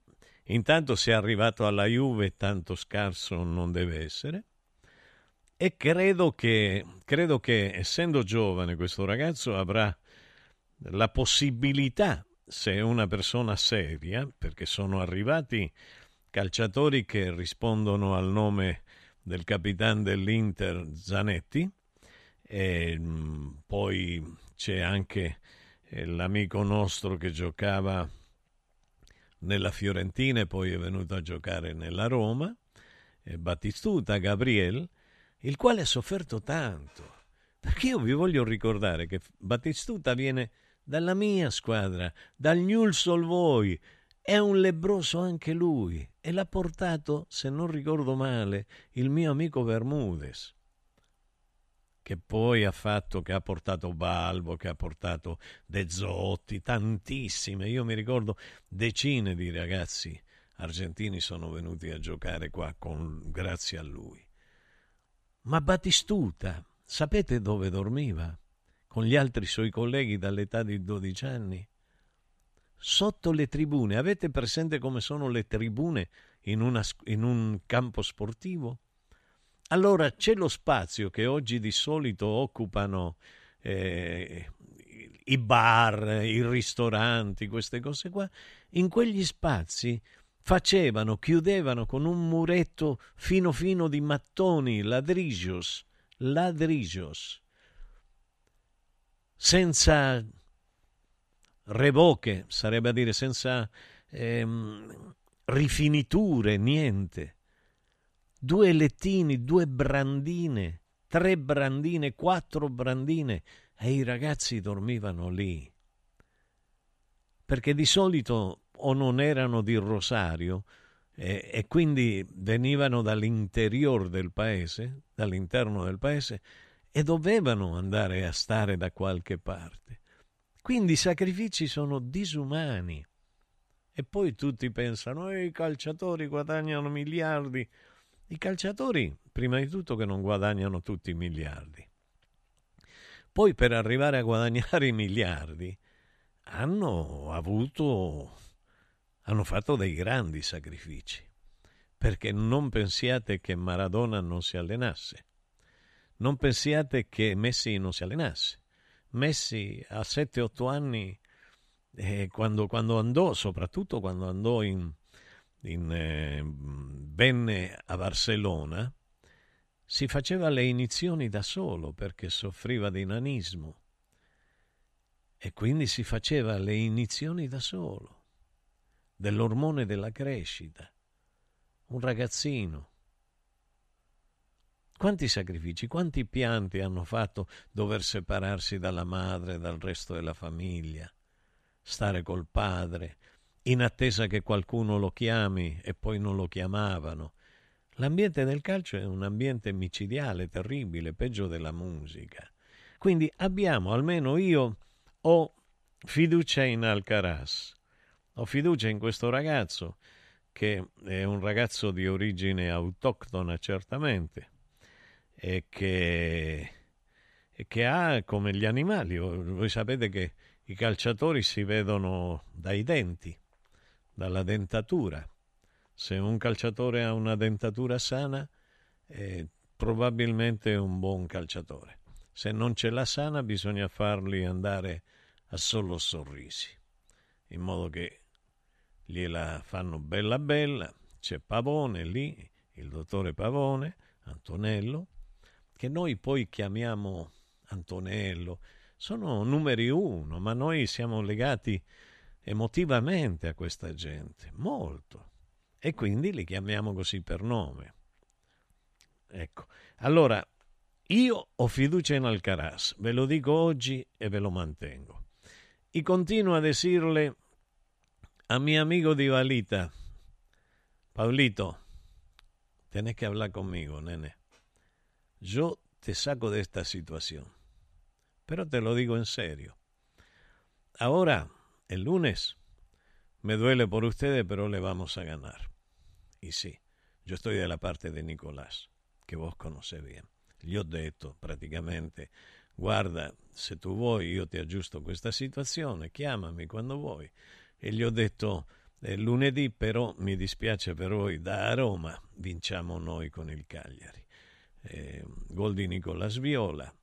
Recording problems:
uneven, jittery; strongly; from 1.5 s to 4:48

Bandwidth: 13.5 kHz